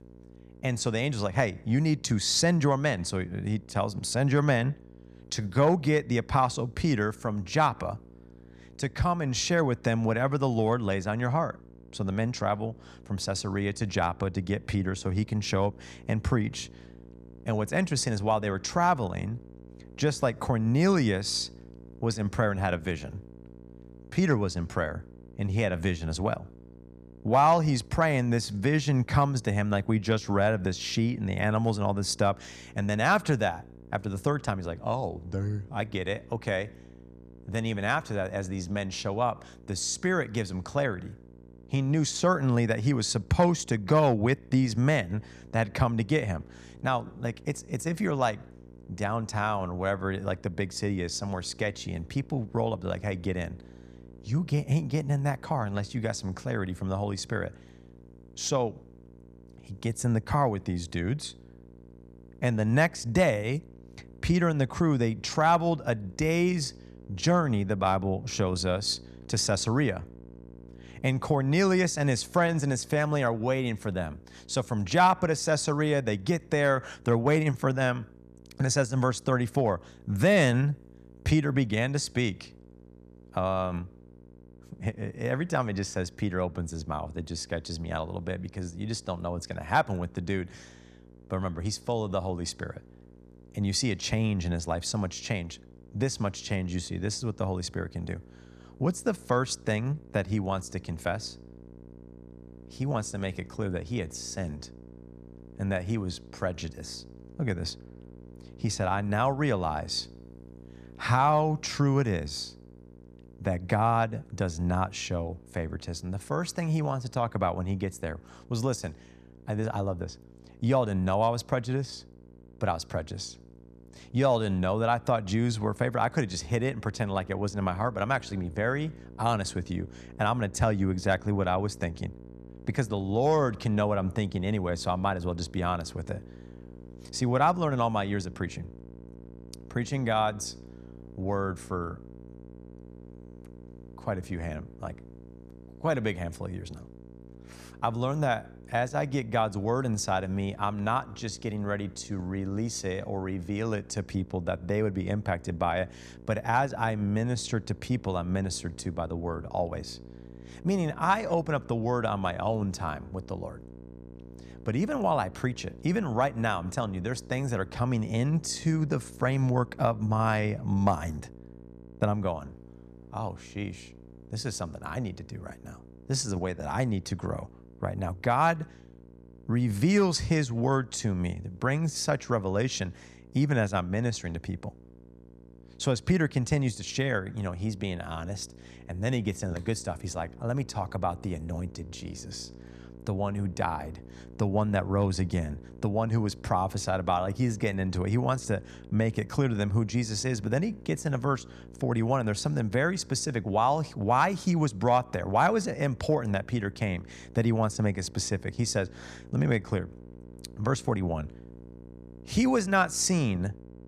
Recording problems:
electrical hum; faint; throughout; 60 Hz, 25 dB below the speech

